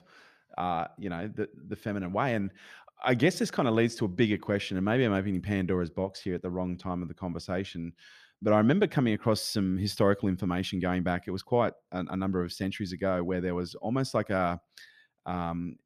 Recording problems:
none

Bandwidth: 14.5 kHz